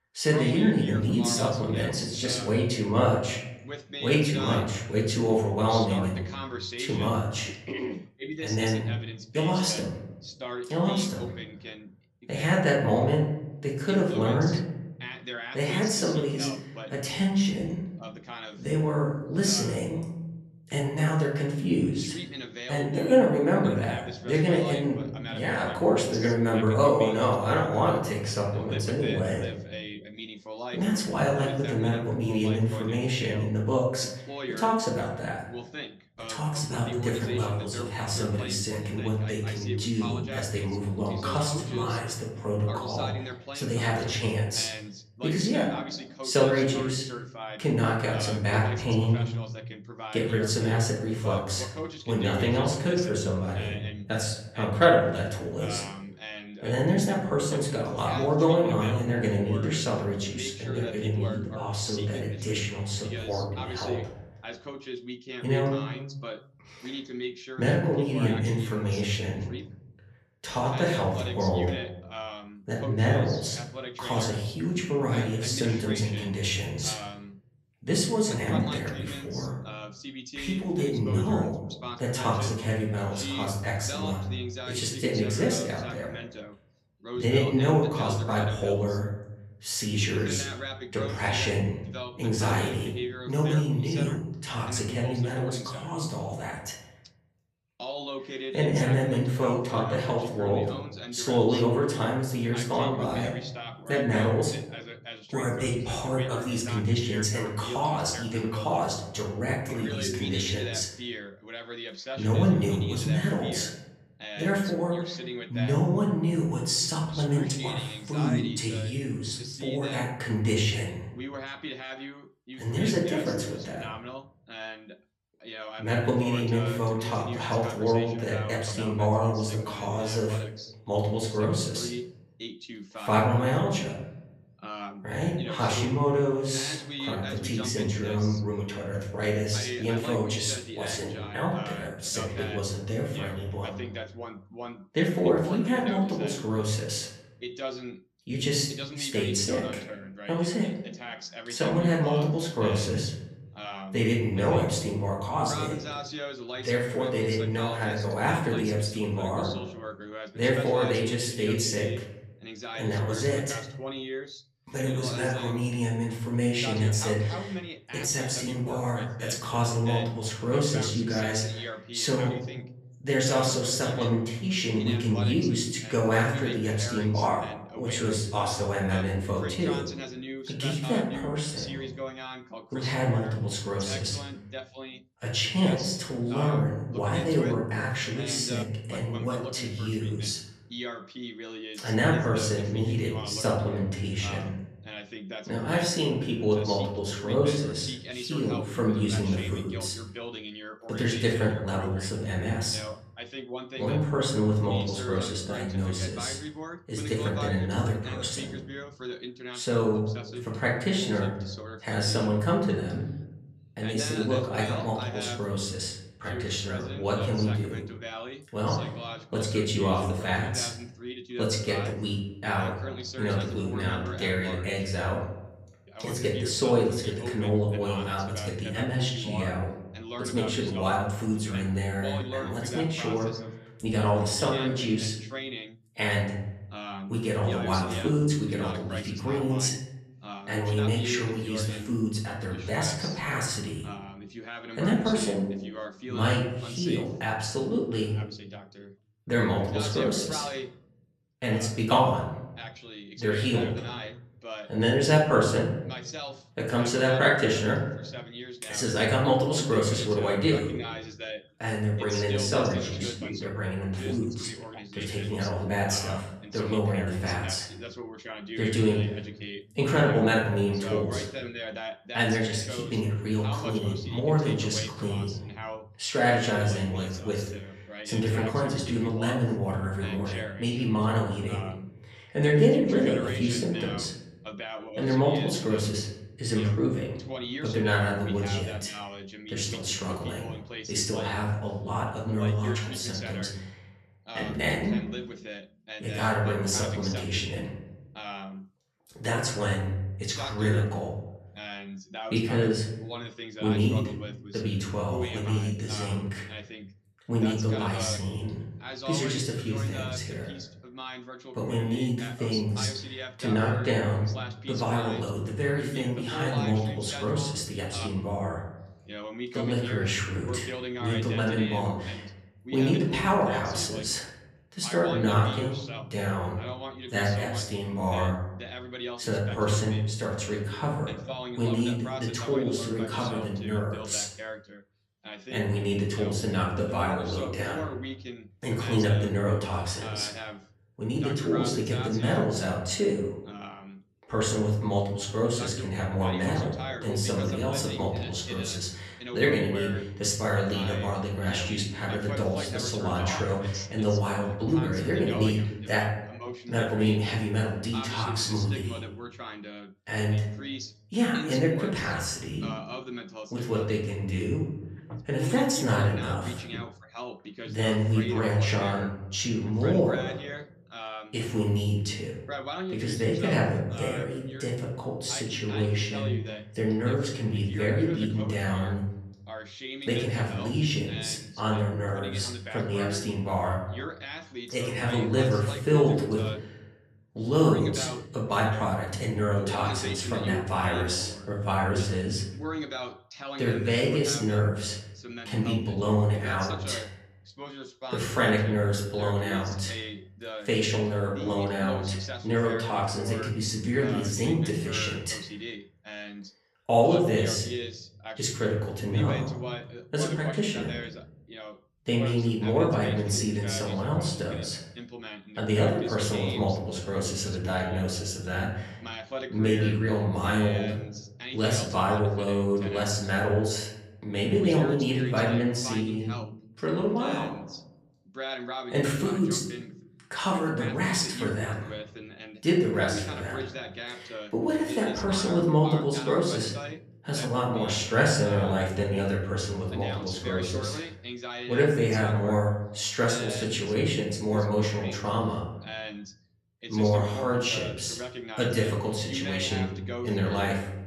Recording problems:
off-mic speech; far
room echo; slight; dies away in 0.7 s
voice in the background; noticeable; throughout; 10 dB below the speech

